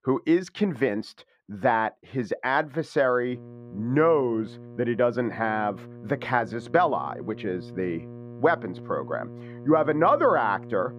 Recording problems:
muffled; very; fading above 3.5 kHz
electrical hum; faint; from 3.5 s on; 60 Hz, 20 dB below the speech

